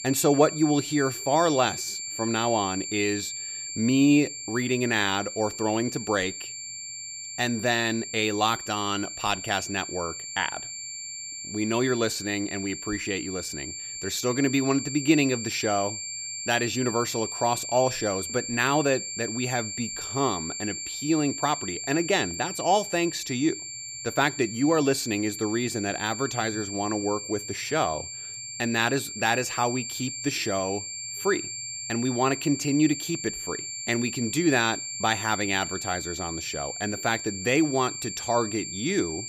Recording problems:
high-pitched whine; loud; throughout; 7.5 kHz, 6 dB below the speech

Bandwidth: 15 kHz